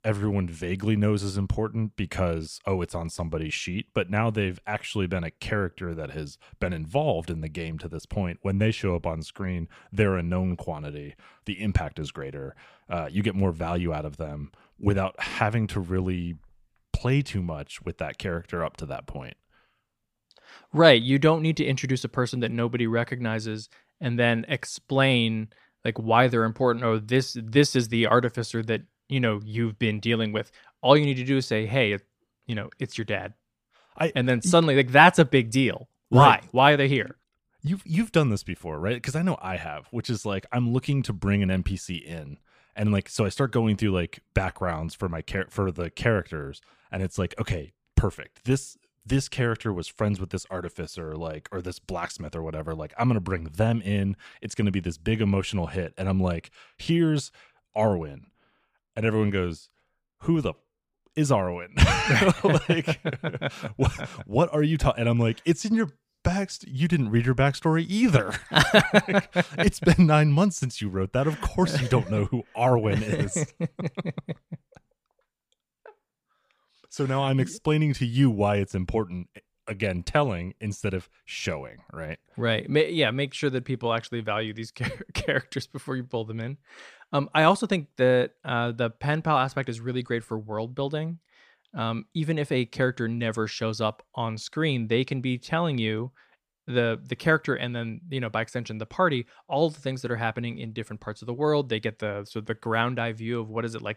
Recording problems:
none

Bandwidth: 15 kHz